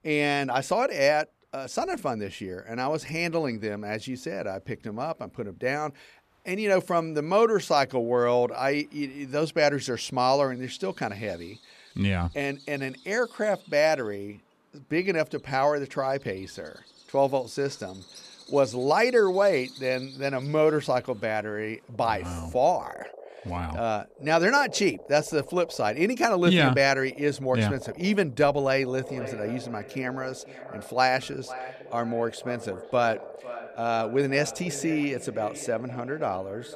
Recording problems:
echo of what is said; noticeable; from 29 s on; 500 ms later, 15 dB below the speech
animal sounds; faint; throughout; 20 dB below the speech

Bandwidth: 14.5 kHz